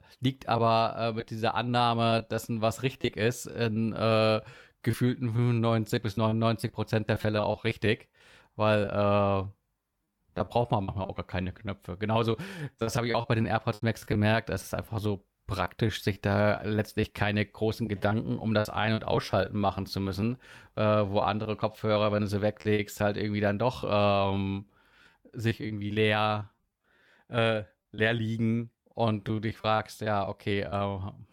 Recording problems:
choppy; very; 9% of the speech affected

